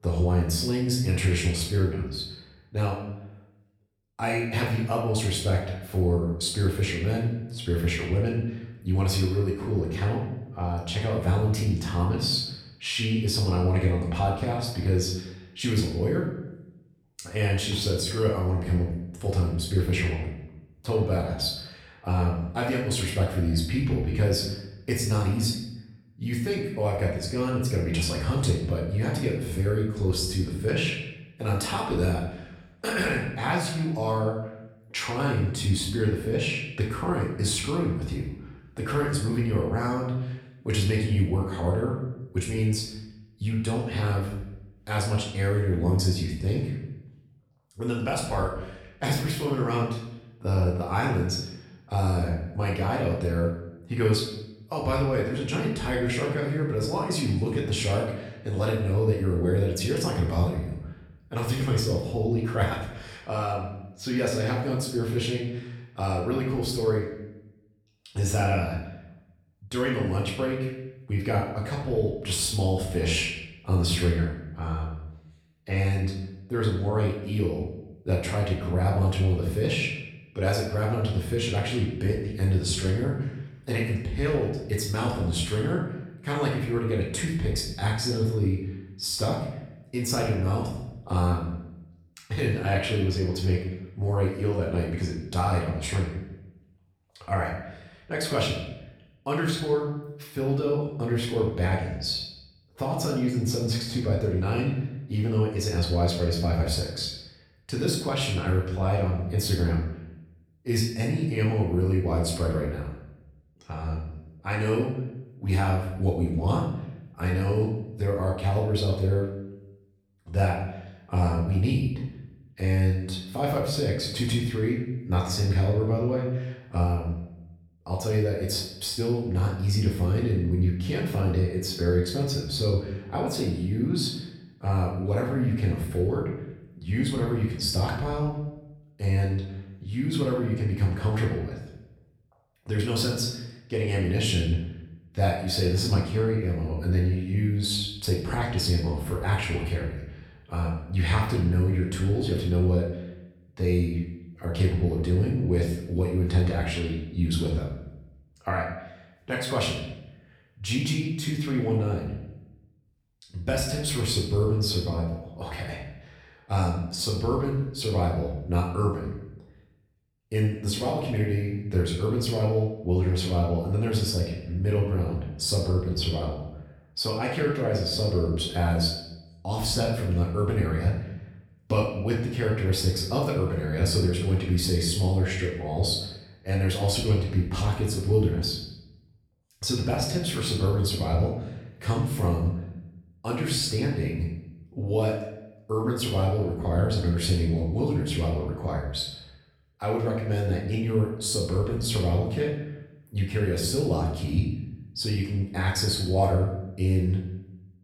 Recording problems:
off-mic speech; far
room echo; noticeable; dies away in 0.7 s

